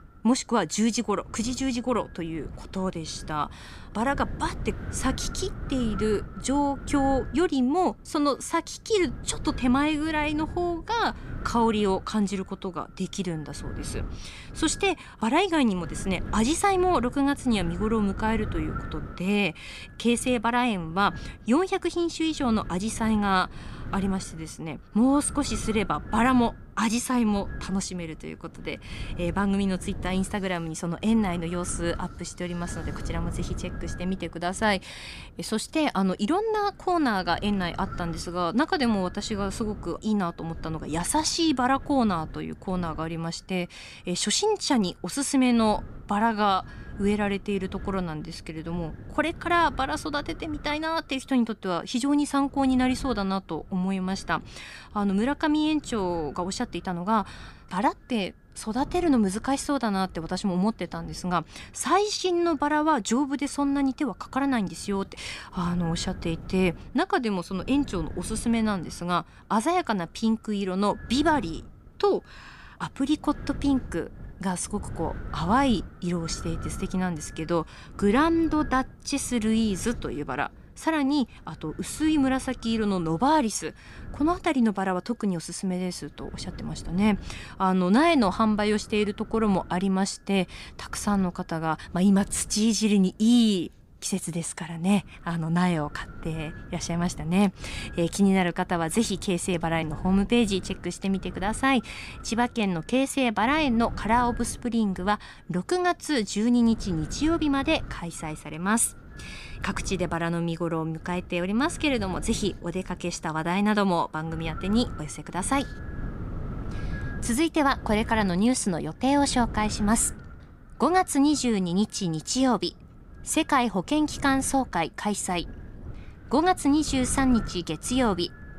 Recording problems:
wind noise on the microphone; occasional gusts; 20 dB below the speech

